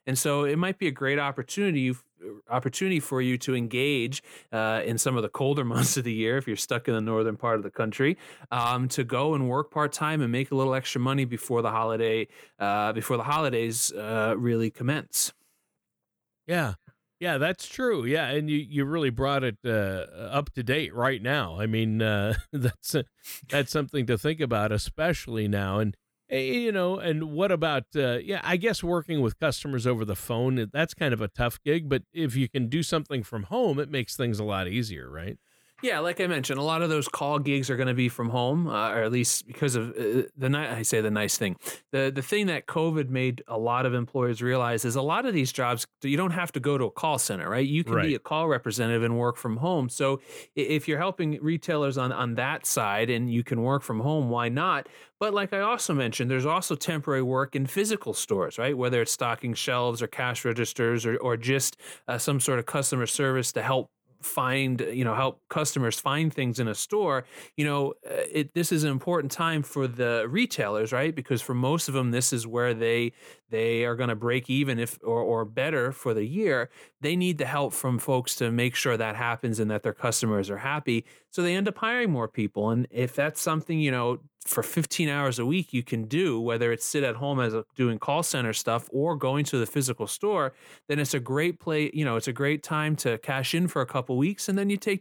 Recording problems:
none

